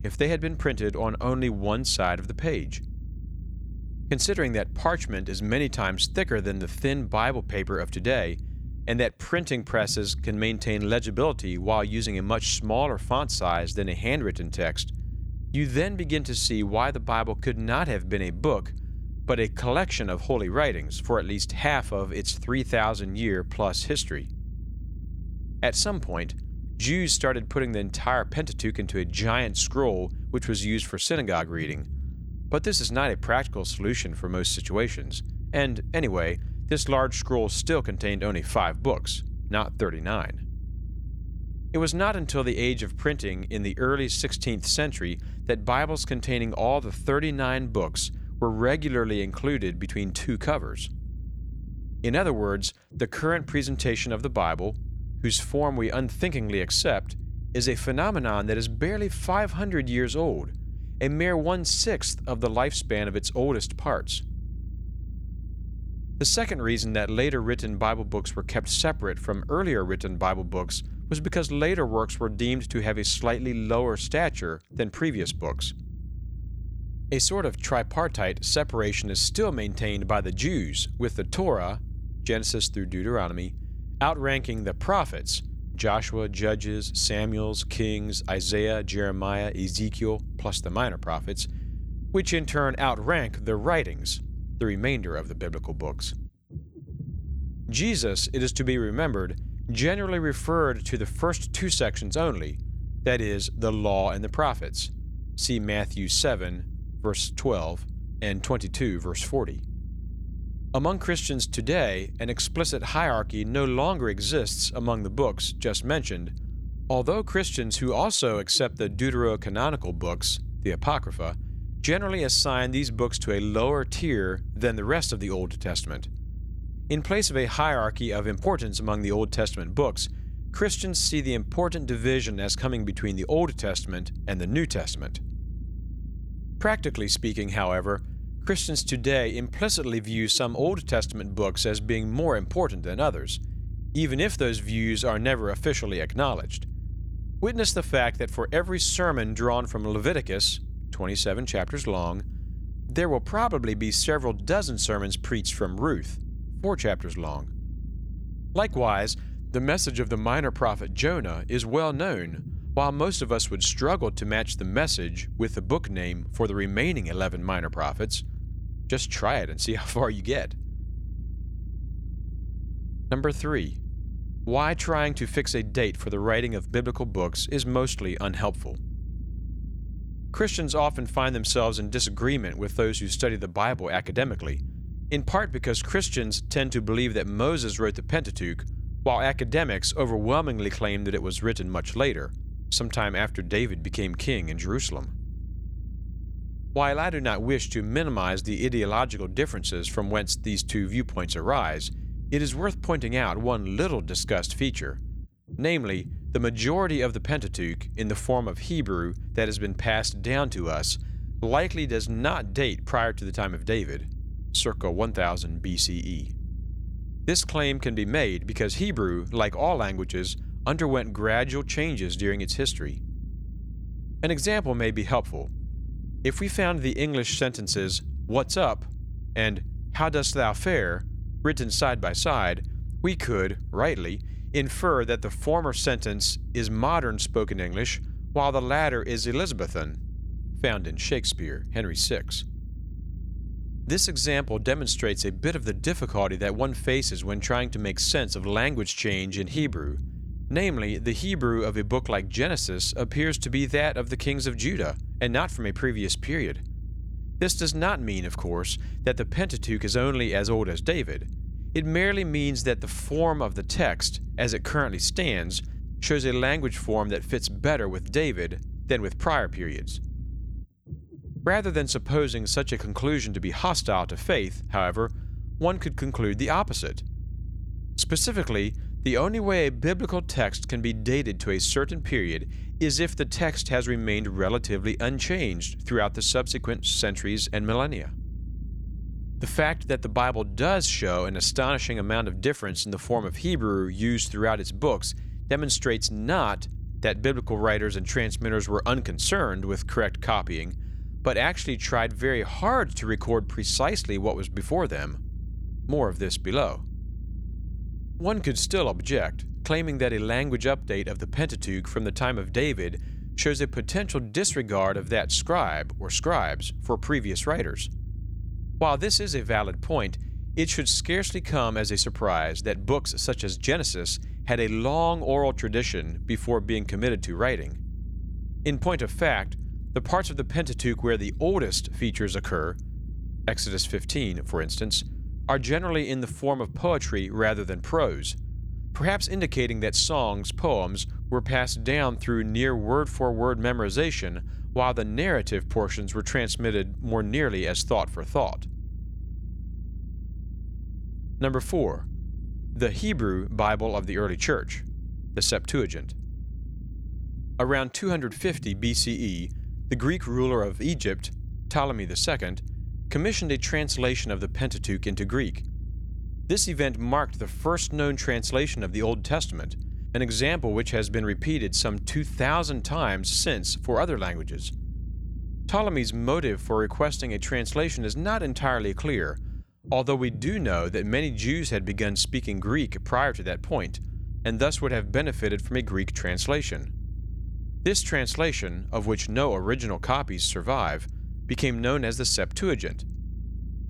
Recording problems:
low rumble; faint; throughout; 25 dB below the speech

